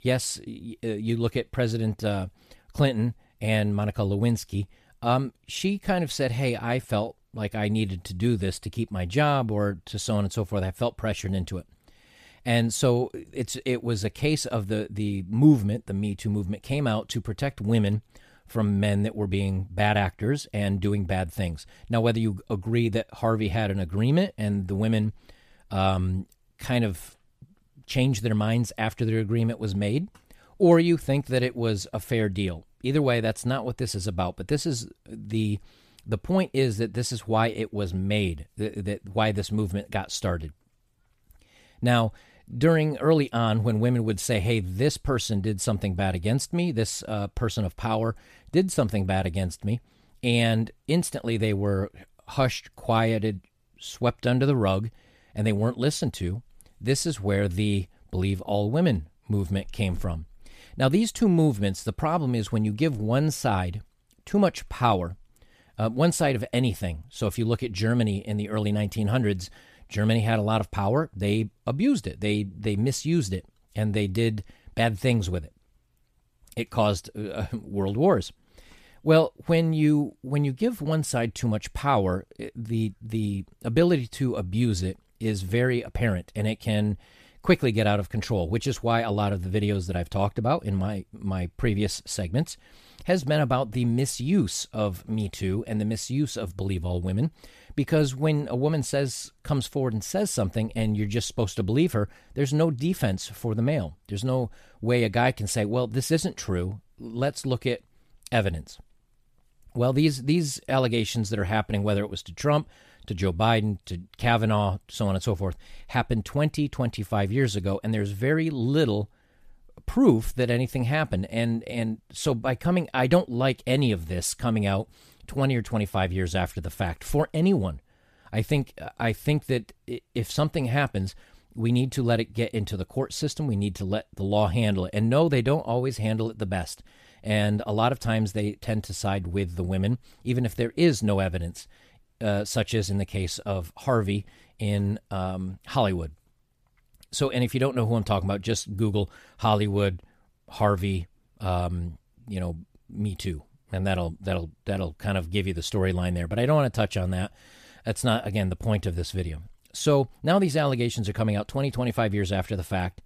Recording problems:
none

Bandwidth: 14.5 kHz